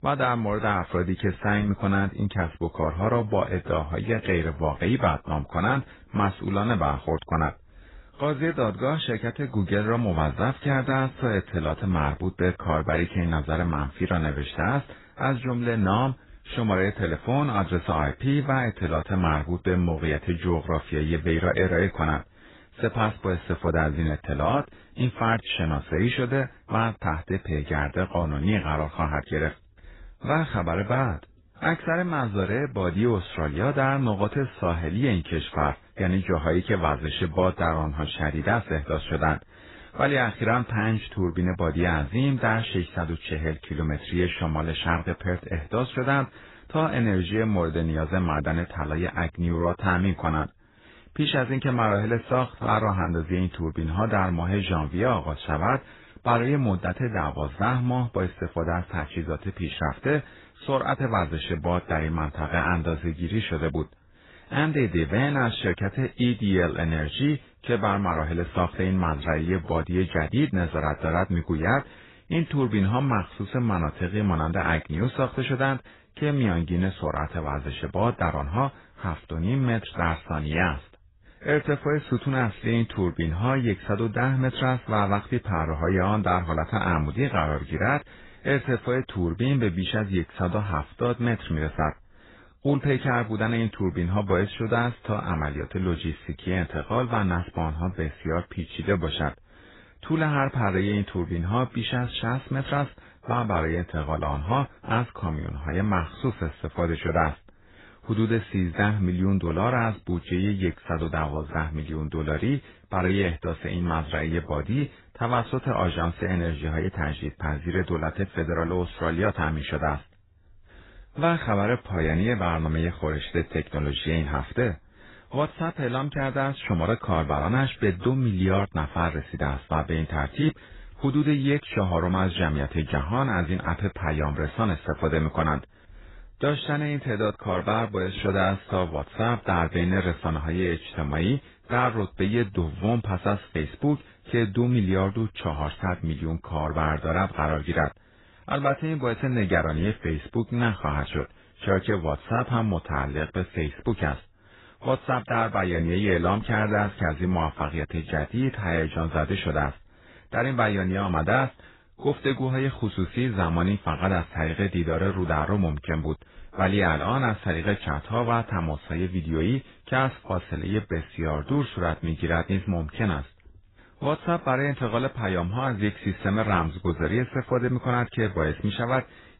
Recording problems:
garbled, watery; badly; nothing above 4 kHz

